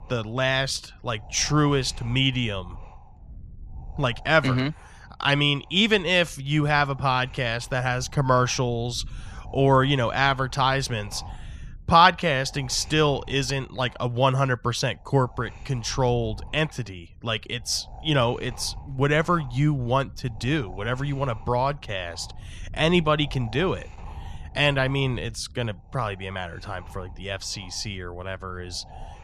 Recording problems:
wind noise on the microphone; occasional gusts; 25 dB below the speech

